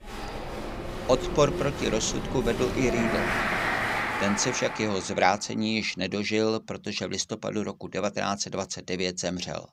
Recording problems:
crowd noise; loud; until 4.5 s; 2 dB below the speech

